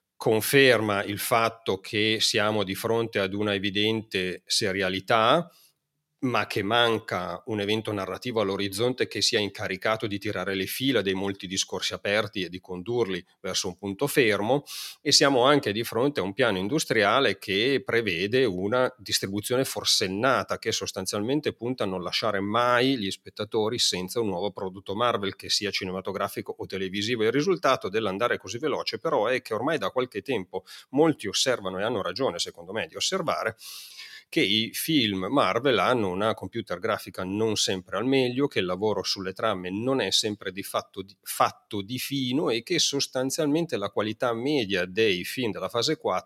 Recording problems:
none

